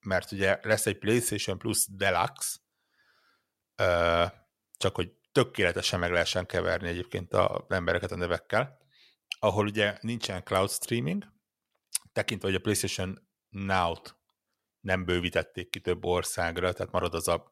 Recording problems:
none

